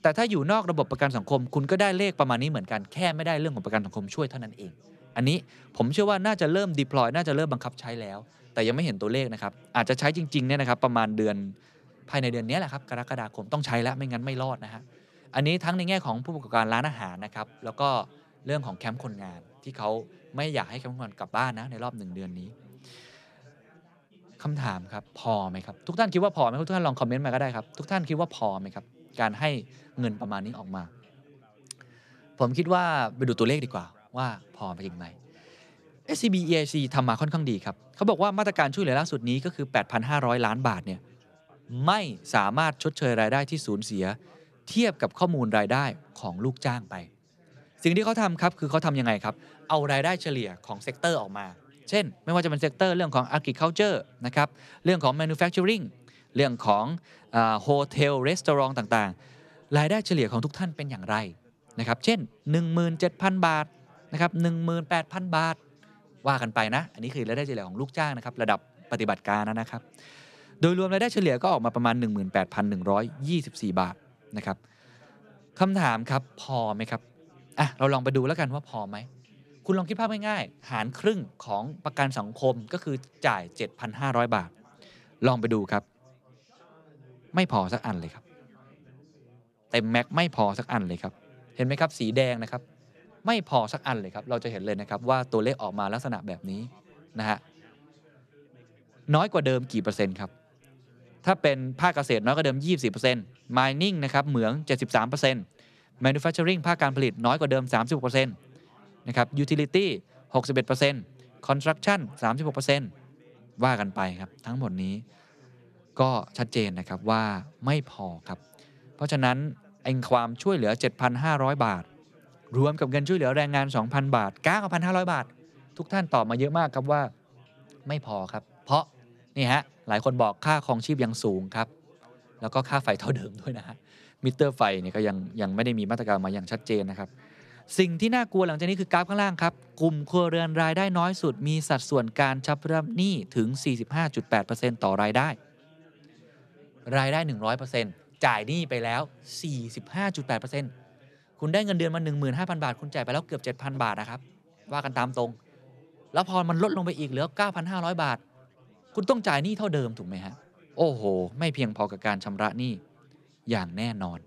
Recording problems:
chatter from many people; faint; throughout; 30 dB below the speech

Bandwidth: 14 kHz